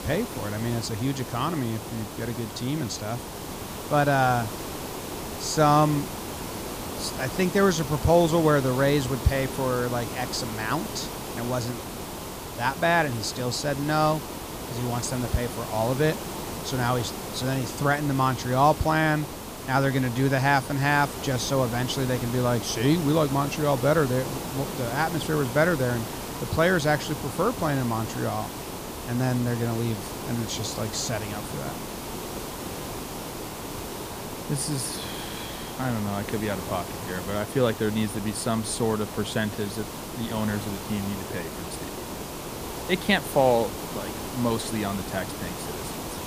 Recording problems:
hiss; loud; throughout; 8 dB below the speech

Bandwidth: 15 kHz